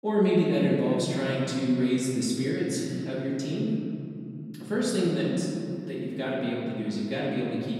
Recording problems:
off-mic speech; far
room echo; noticeable; dies away in 2.9 s

